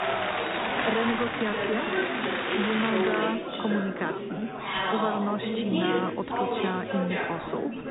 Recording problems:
high frequencies cut off; severe; nothing above 4 kHz
chatter from many people; very loud; throughout; 2 dB above the speech

